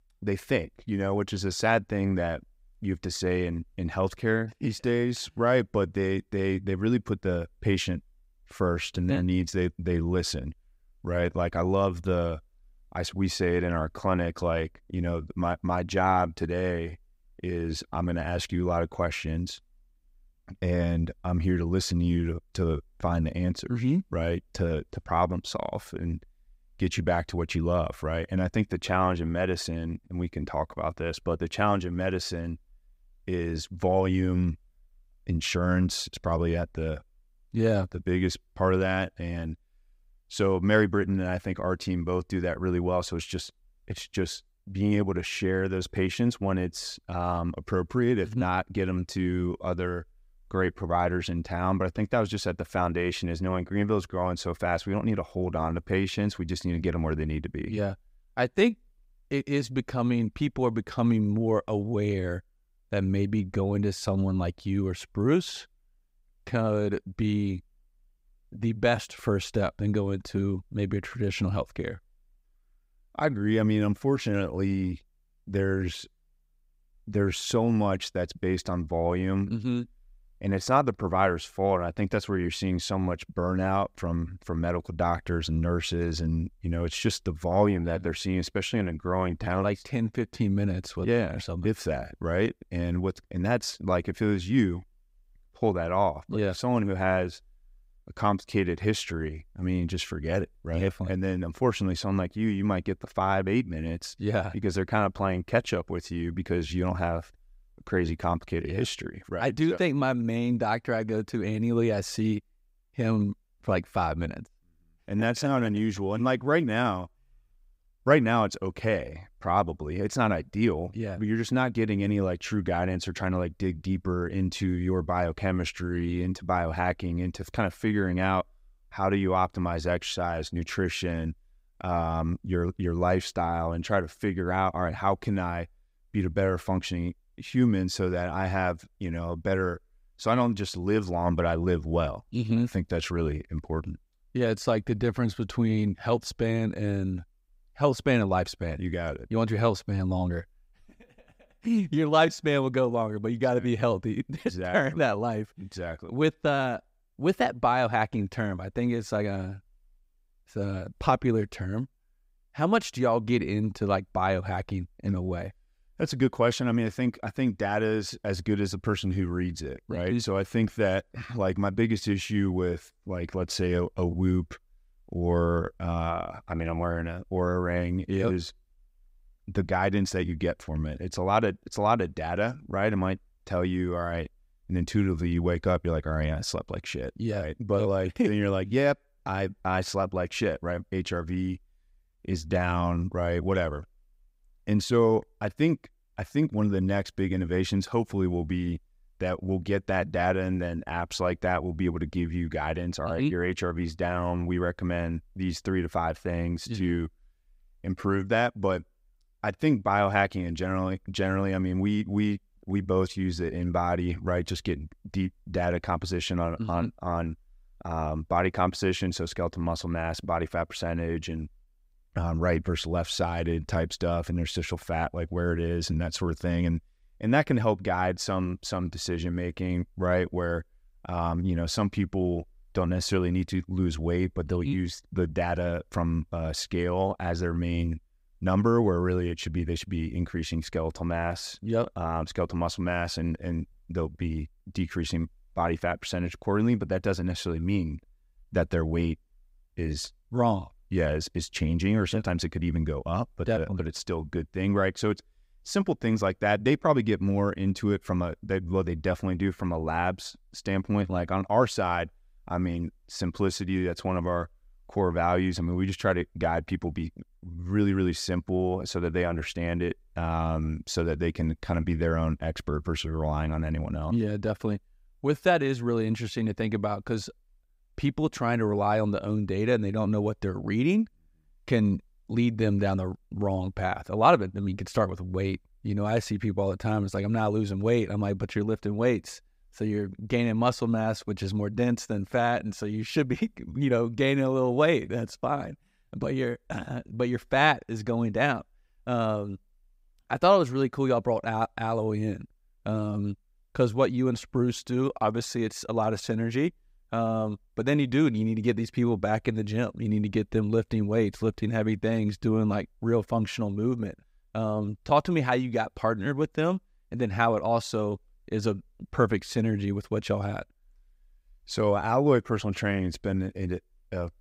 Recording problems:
none

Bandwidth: 15.5 kHz